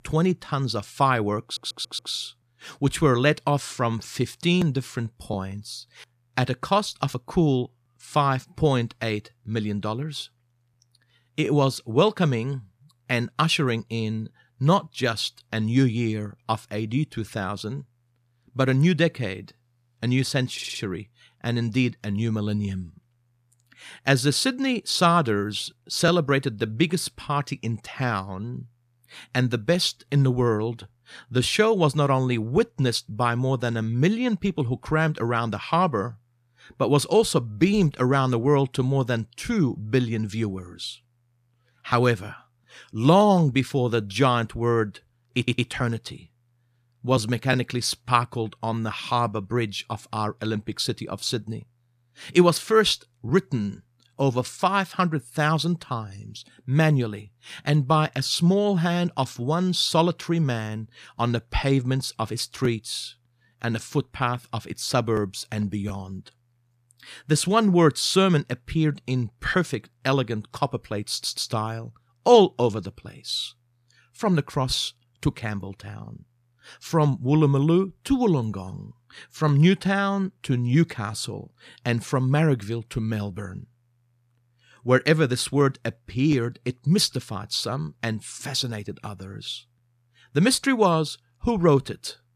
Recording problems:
audio stuttering; 4 times, first at 1.5 s

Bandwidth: 14.5 kHz